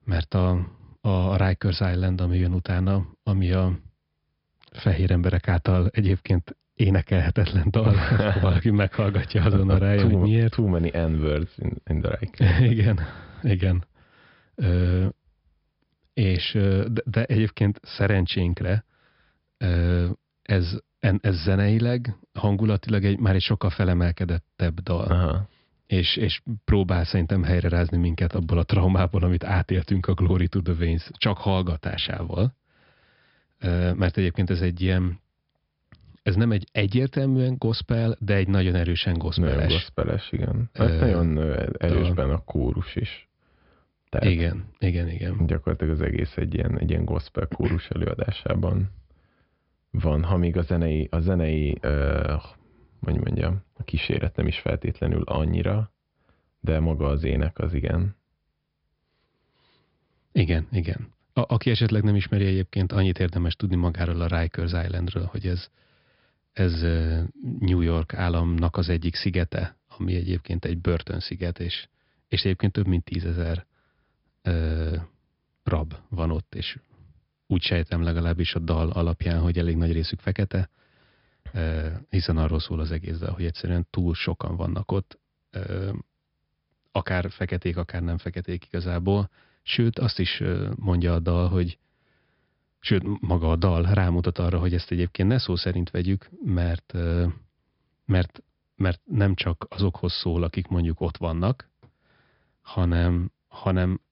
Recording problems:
high frequencies cut off; noticeable; nothing above 5.5 kHz

